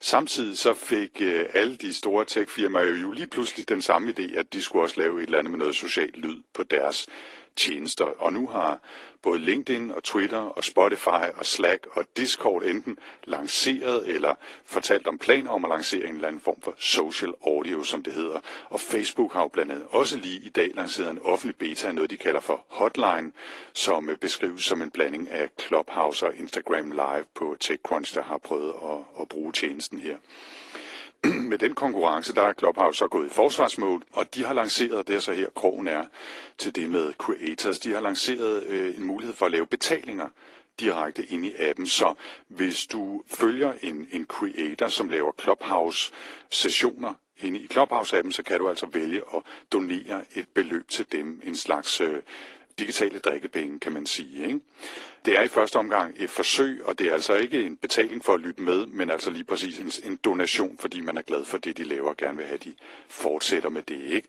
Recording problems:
thin; somewhat; fading below 300 Hz
garbled, watery; slightly; nothing above 15.5 kHz

